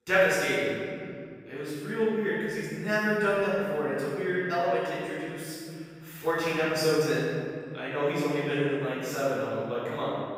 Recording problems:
room echo; strong; dies away in 2.9 s
off-mic speech; far

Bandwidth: 15.5 kHz